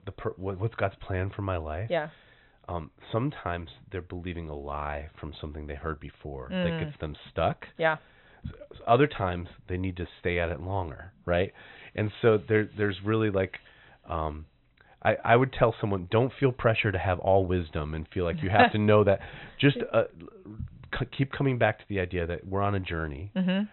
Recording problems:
high frequencies cut off; severe; nothing above 4 kHz

